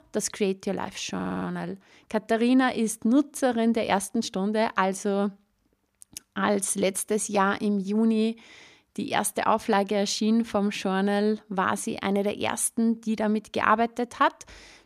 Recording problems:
audio stuttering; at 1 s

